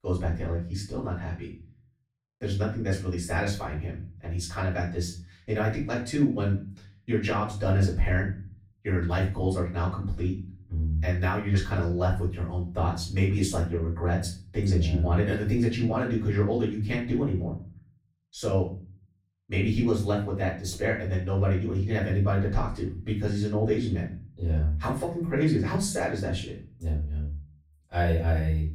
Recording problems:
off-mic speech; far
room echo; slight; dies away in 0.4 s

